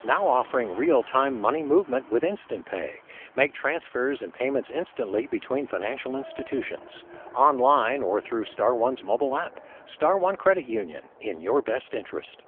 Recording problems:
phone-call audio; poor line; nothing above 3.5 kHz
traffic noise; faint; throughout; 20 dB below the speech

